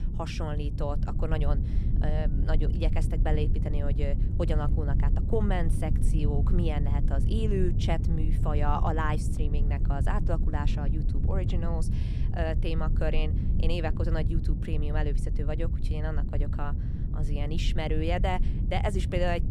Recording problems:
low rumble; loud; throughout; 8 dB below the speech

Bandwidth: 14.5 kHz